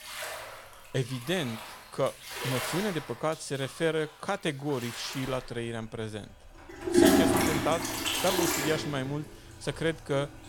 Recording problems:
household noises; very loud; throughout; 4 dB above the speech

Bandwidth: 17.5 kHz